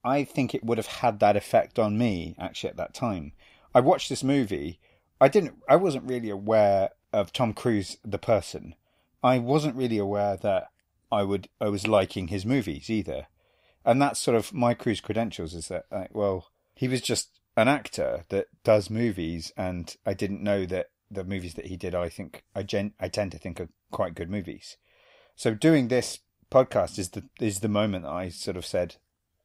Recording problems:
none

